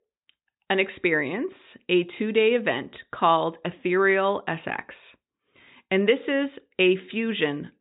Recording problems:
high frequencies cut off; severe; nothing above 4 kHz

